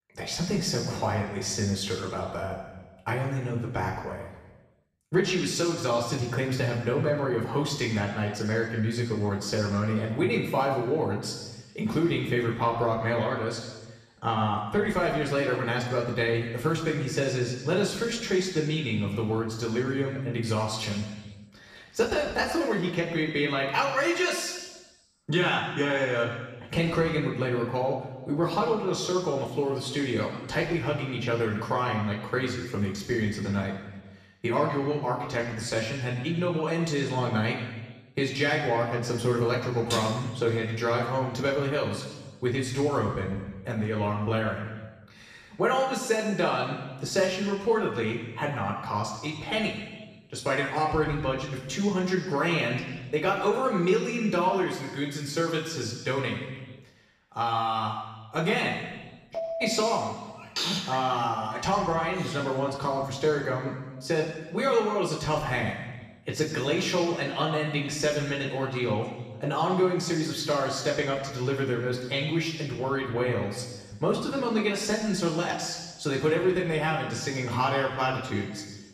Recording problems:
off-mic speech; far
room echo; noticeable; dies away in 1.2 s

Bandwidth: 14.5 kHz